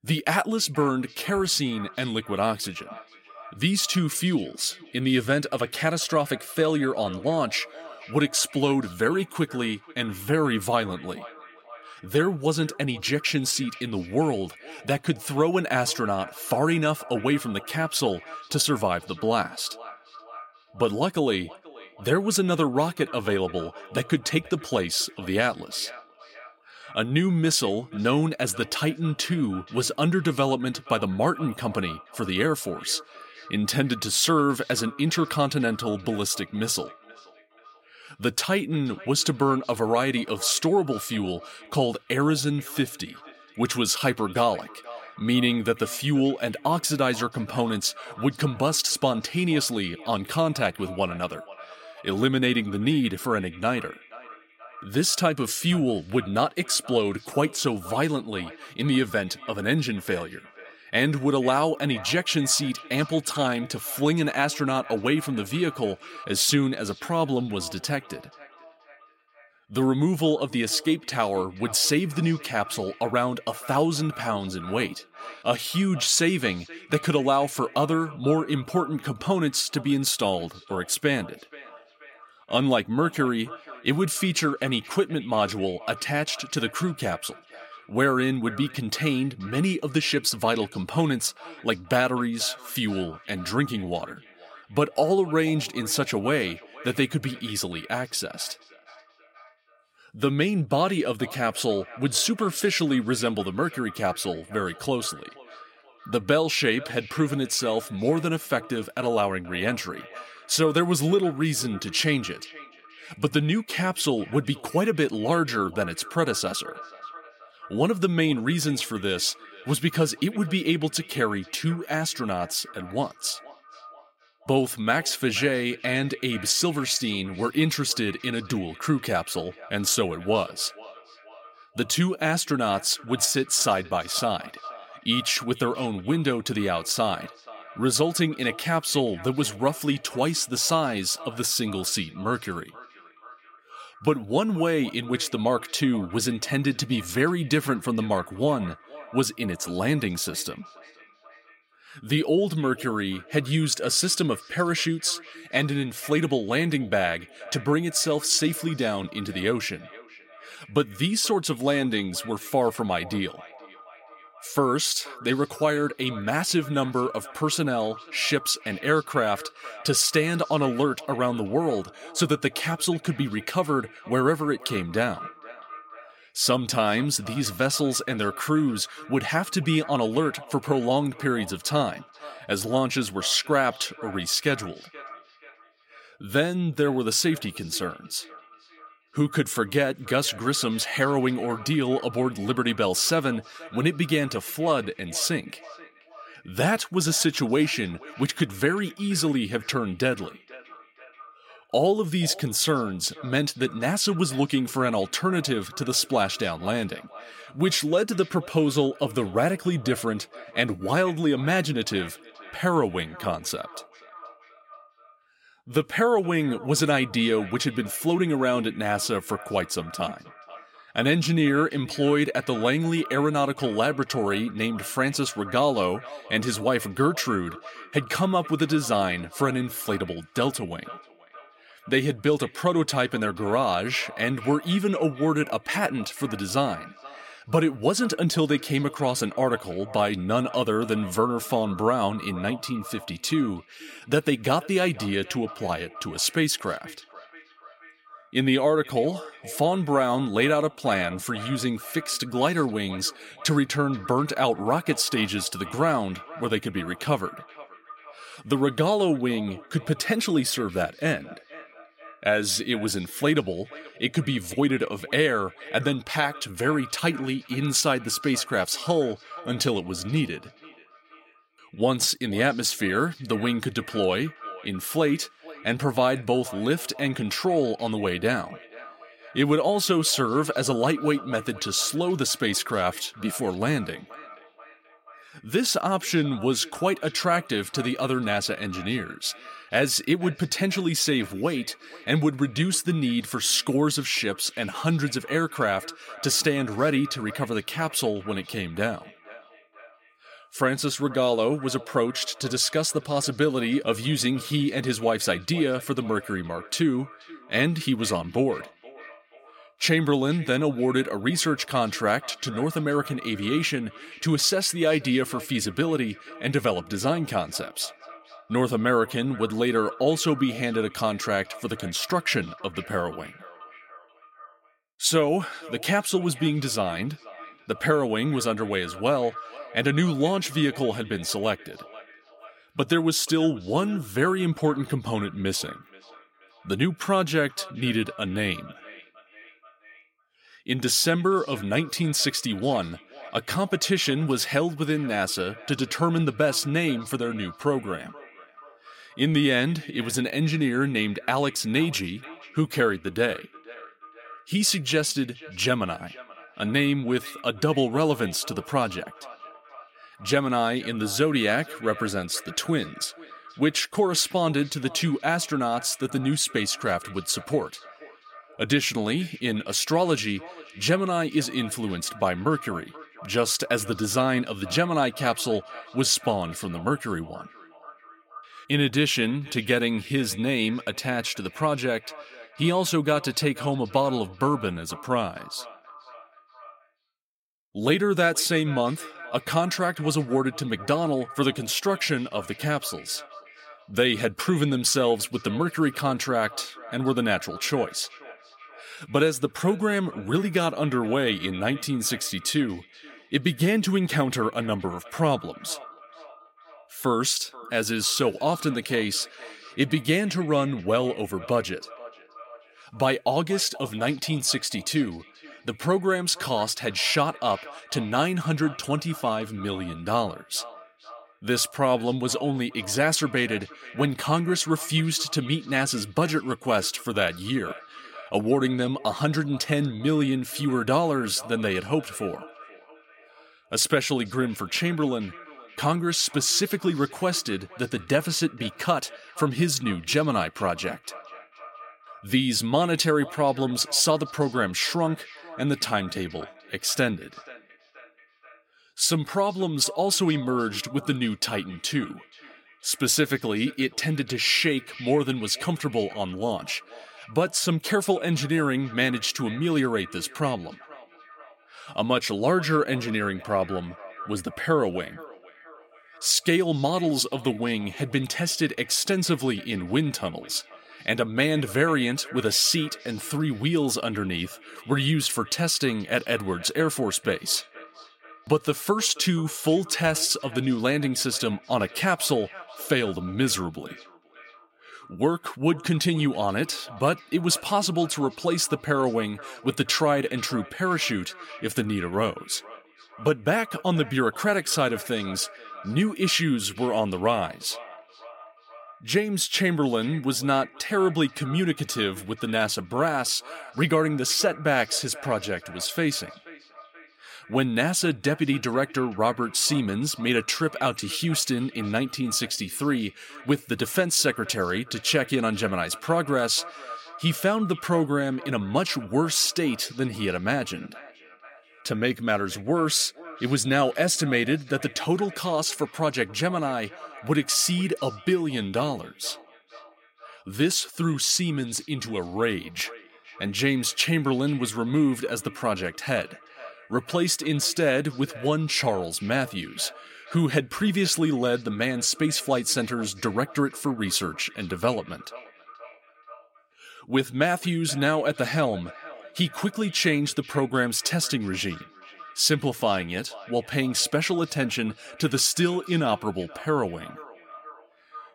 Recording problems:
echo of what is said; faint; throughout; 480 ms later, 20 dB below the speech

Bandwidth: 16.5 kHz